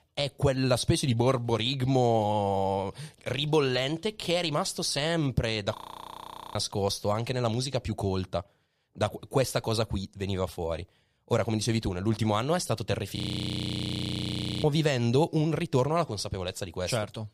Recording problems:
audio freezing; at 6 s for 1 s and at 13 s for 1.5 s

